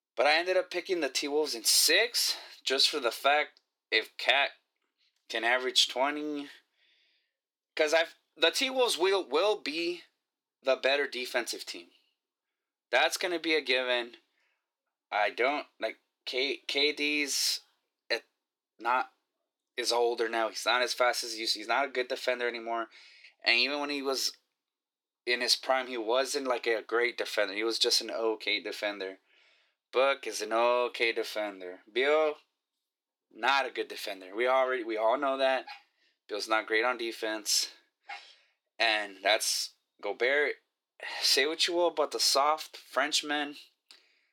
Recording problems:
thin; very; fading below 350 Hz

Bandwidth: 17 kHz